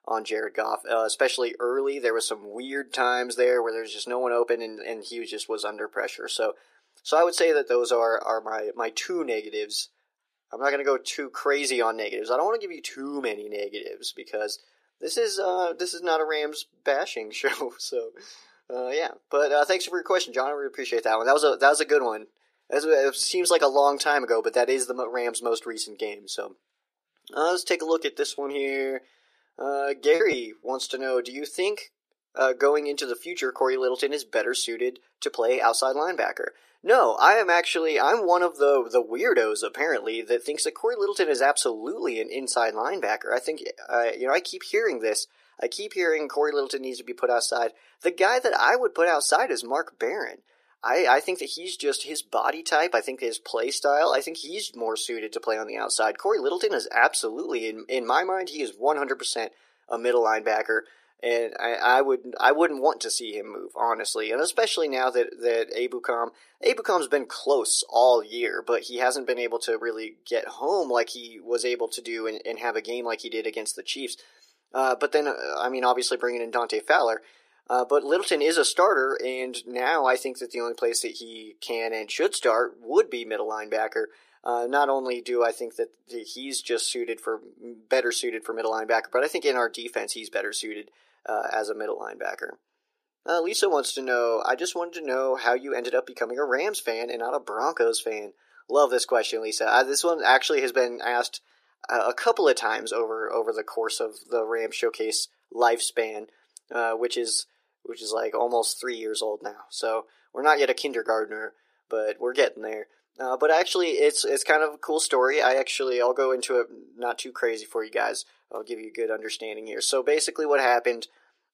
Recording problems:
thin; very; fading below 350 Hz
choppy; occasionally; from 28 to 31 s; 5% of the speech affected

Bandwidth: 14.5 kHz